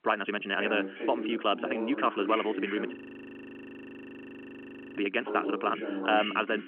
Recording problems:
wrong speed, natural pitch; too fast; 1.6 times normal speed
phone-call audio; nothing above 3 kHz
voice in the background; loud; throughout; 7 dB below the speech
audio freezing; at 3 s for 2 s

